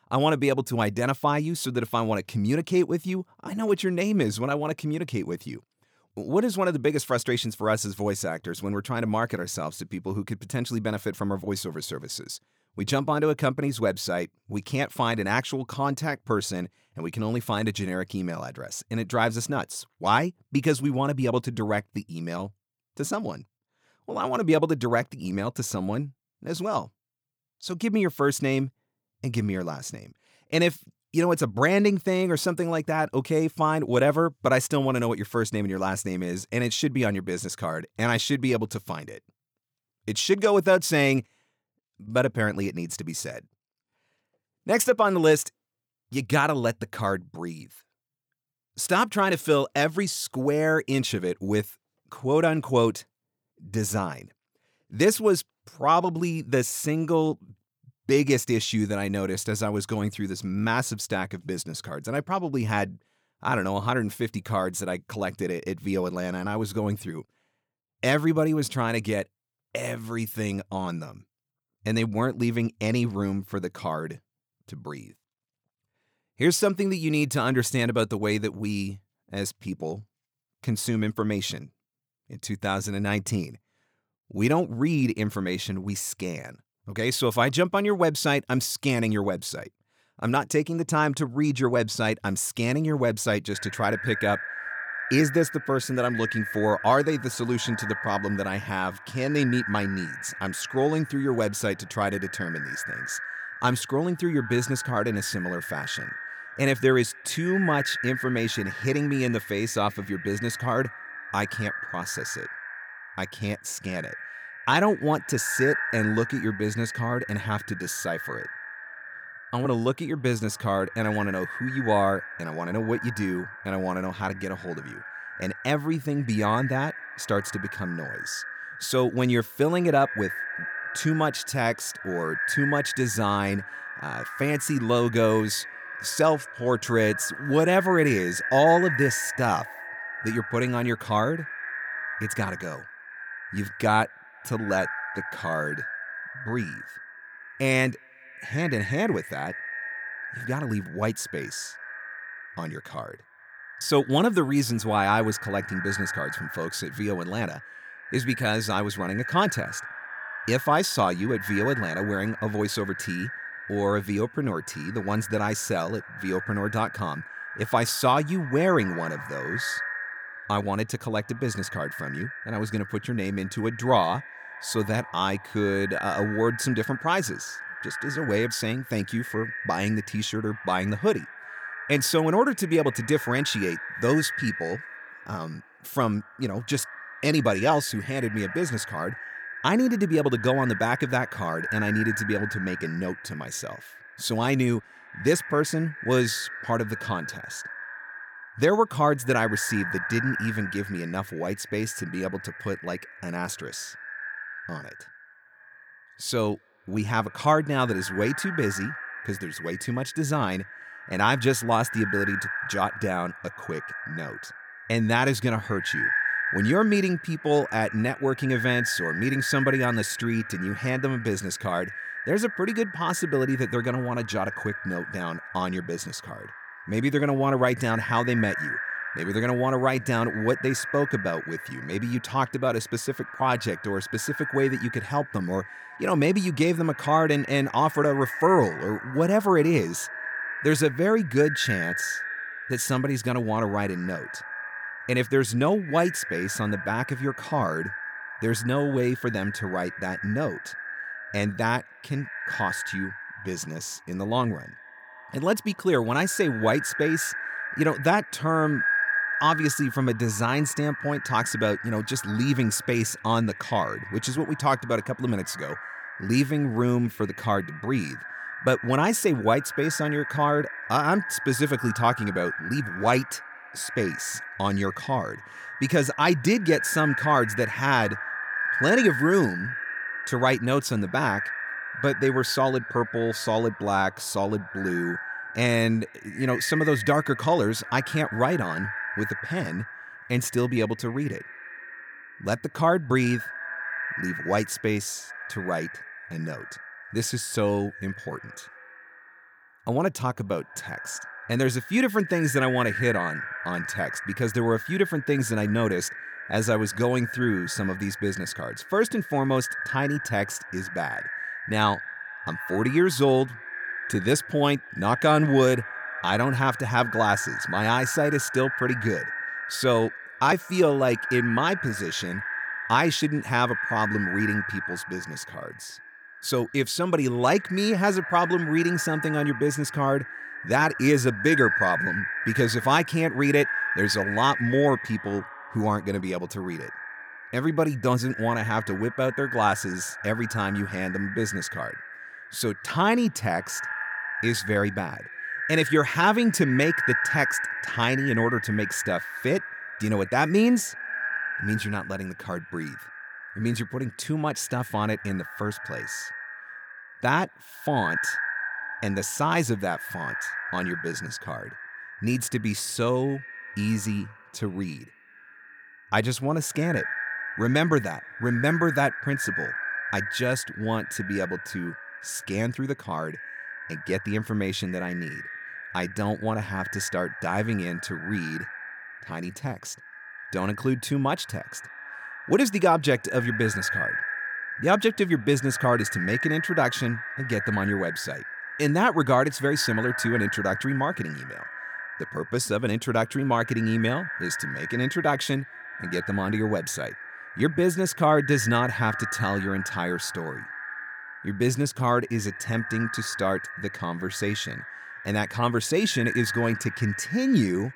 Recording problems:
echo of what is said; strong; from 1:34 on; 210 ms later, 7 dB below the speech

